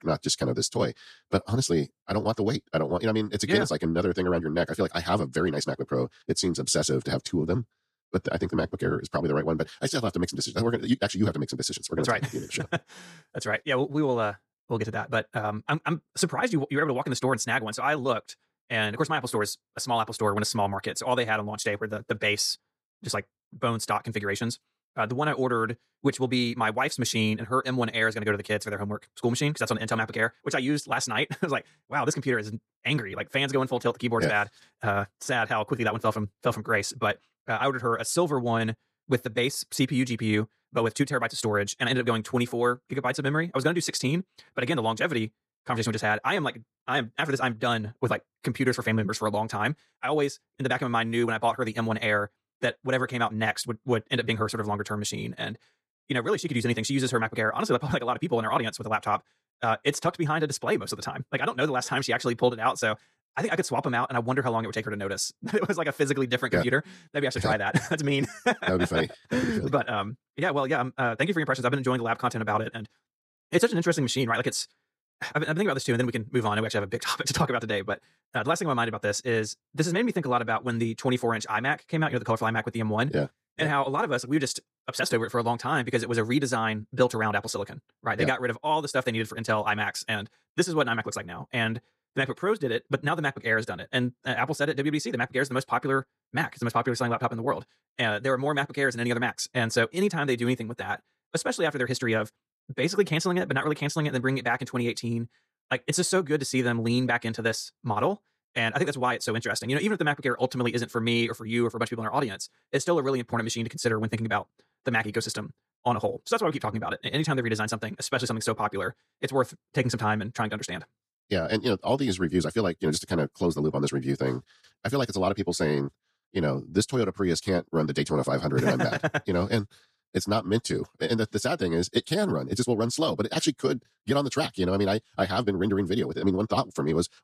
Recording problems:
wrong speed, natural pitch; too fast; 1.7 times normal speed

